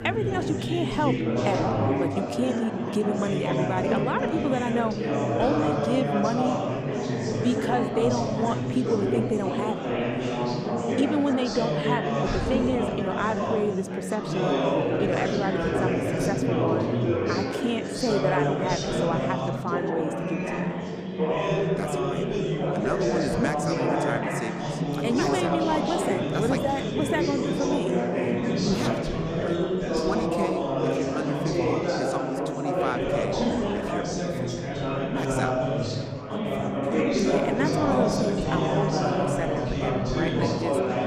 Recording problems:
chatter from many people; very loud; throughout; 4 dB above the speech

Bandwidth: 15 kHz